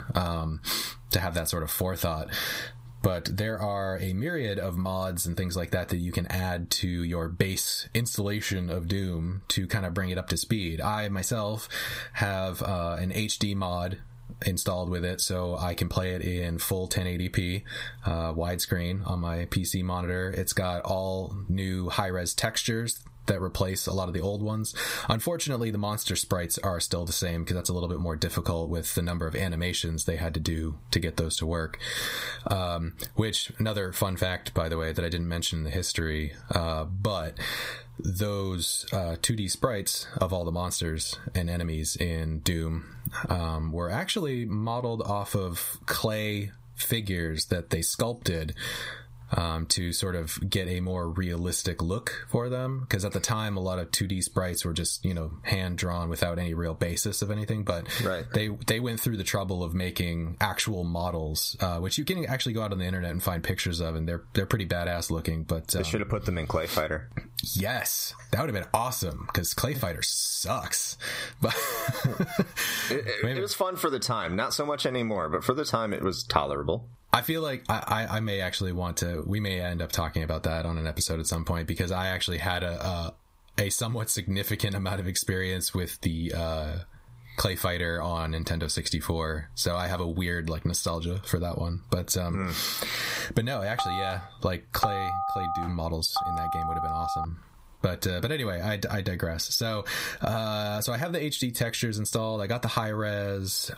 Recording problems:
squashed, flat; heavily
phone ringing; loud; from 1:34 to 1:37; peak 1 dB above the speech

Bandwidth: 15.5 kHz